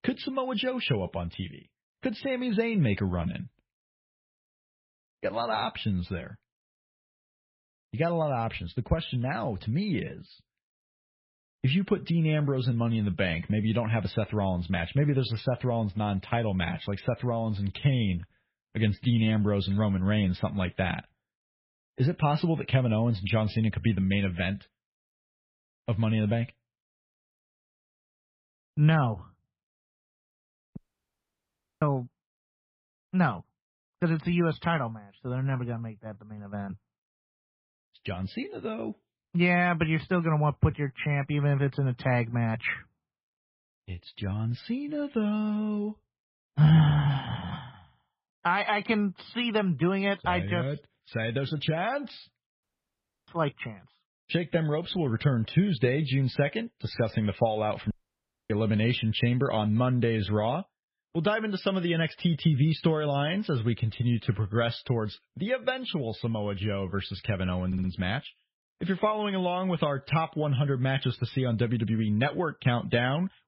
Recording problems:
garbled, watery; badly; nothing above 5.5 kHz
muffled; very slightly; fading above 3 kHz
audio cutting out; at 31 s for 1 s, at 53 s for 0.5 s and at 58 s for 0.5 s
audio stuttering; at 1:08

